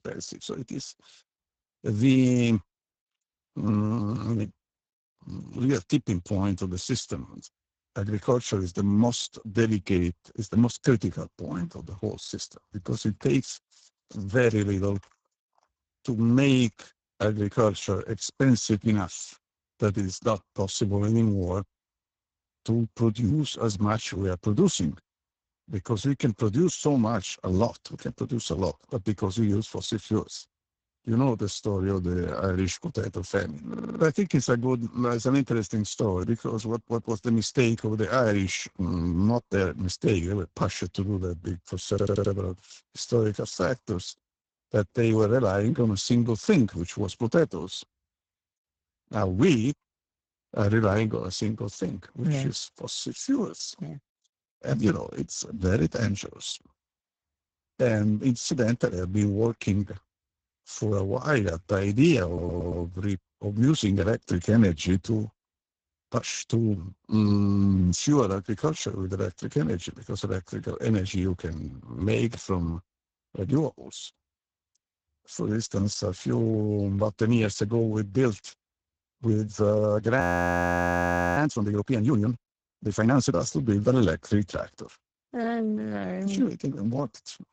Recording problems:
garbled, watery; badly; nothing above 7.5 kHz
audio stuttering; at 34 s, at 42 s and at 1:02
audio freezing; at 1:20 for 1 s

